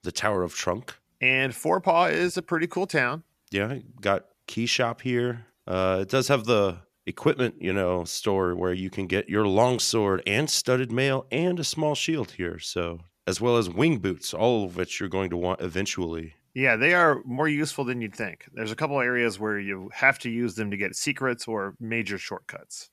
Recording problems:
none

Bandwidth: 14.5 kHz